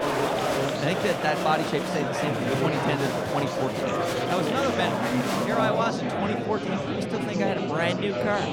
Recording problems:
murmuring crowd; very loud; throughout; 2 dB above the speech

